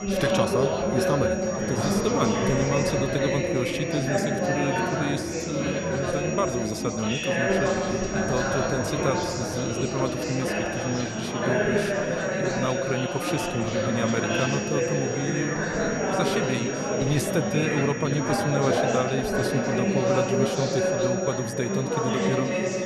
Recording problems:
chatter from many people; very loud; throughout; 3 dB above the speech
high-pitched whine; loud; throughout; 5.5 kHz, 9 dB below the speech

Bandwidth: 13.5 kHz